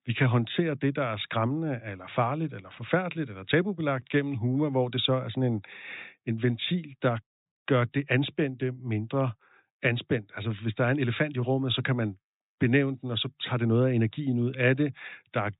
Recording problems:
high frequencies cut off; severe; nothing above 4 kHz

